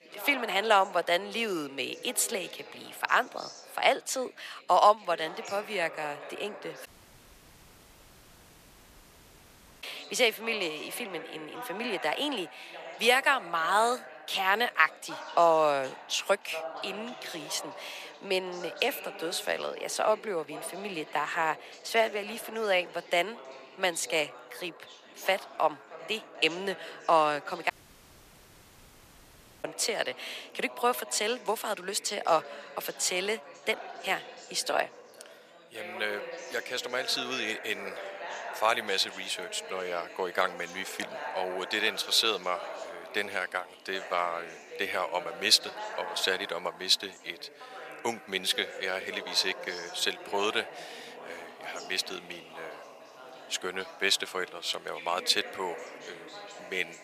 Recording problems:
thin; very; fading below 650 Hz
background chatter; noticeable; throughout; 2 voices, 15 dB below the speech
audio cutting out; at 7 s for 3 s and at 28 s for 2 s

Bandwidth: 14.5 kHz